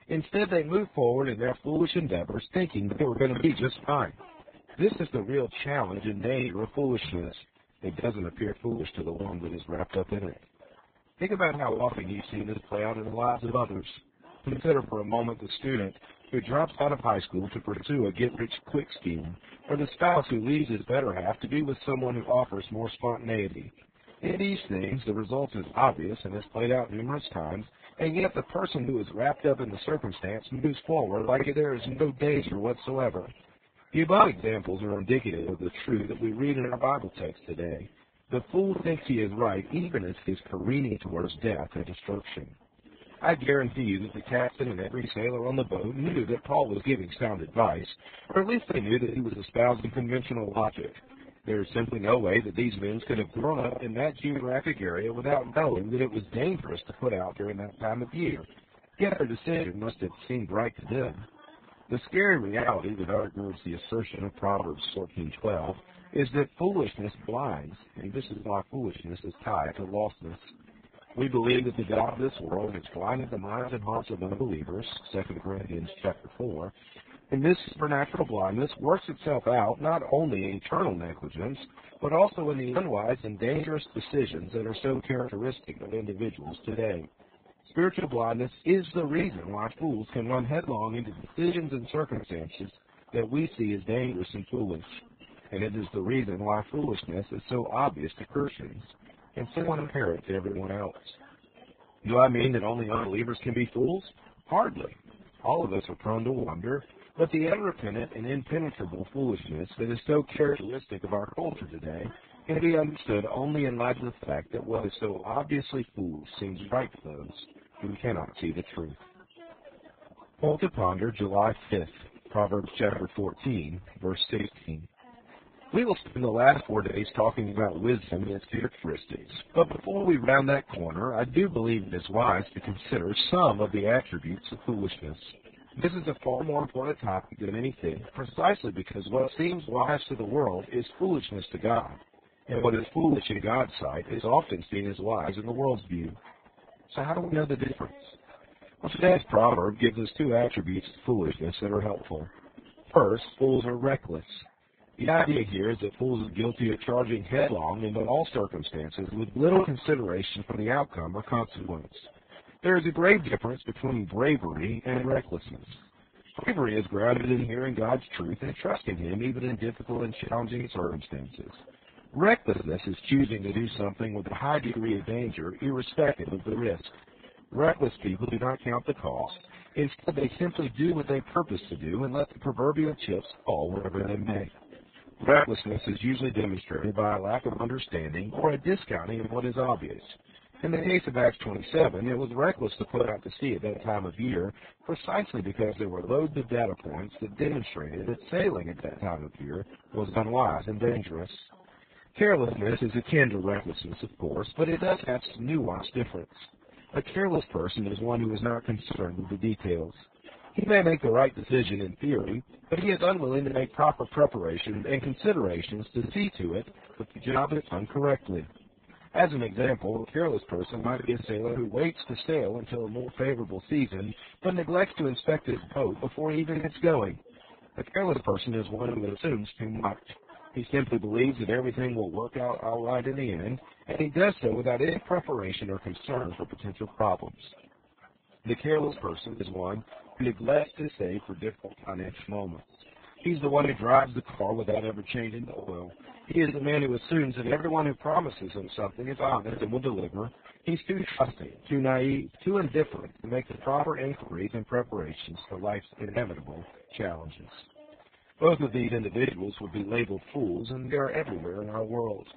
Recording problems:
garbled, watery; badly; nothing above 4 kHz
high frequencies cut off; slight
background chatter; faint; throughout; 2 voices, 30 dB below the speech
choppy; very; 11% of the speech affected

